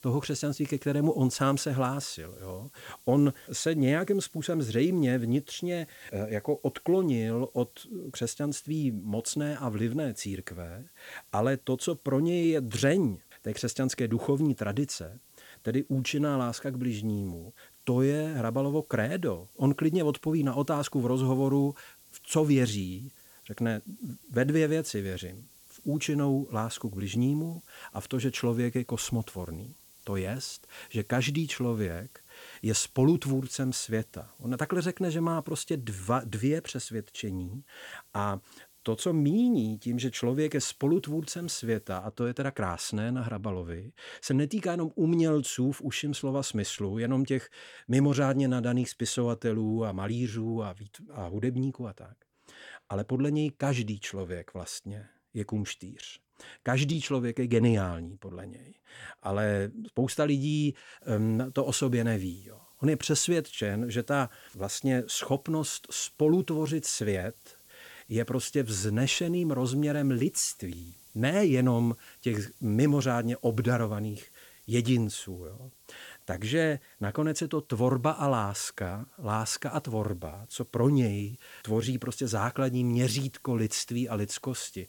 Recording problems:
hiss; faint; until 42 s and from 1:01 on; 25 dB below the speech

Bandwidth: 18 kHz